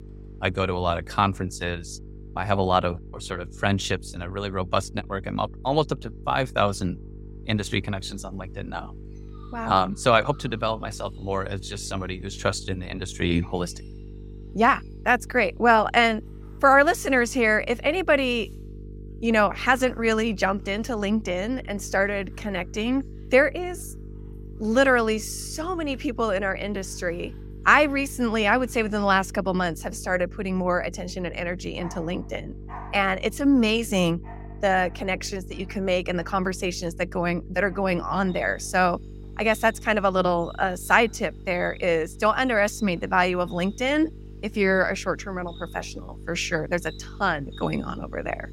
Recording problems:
electrical hum; faint; throughout; 50 Hz, 25 dB below the speech
animal sounds; faint; throughout; 30 dB below the speech

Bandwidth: 16 kHz